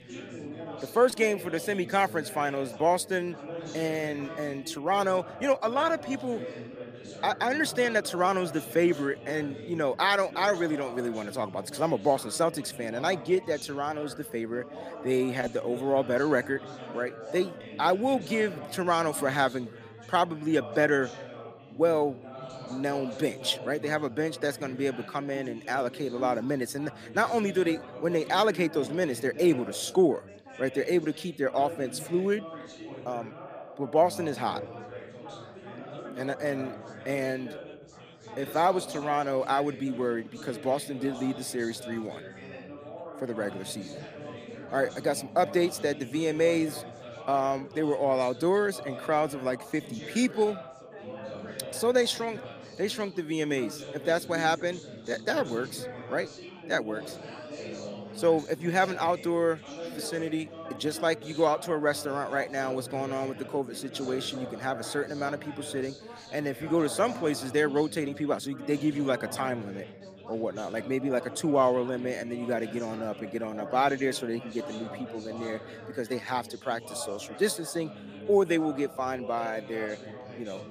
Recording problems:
chatter from many people; noticeable; throughout; 15 dB below the speech

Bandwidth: 15 kHz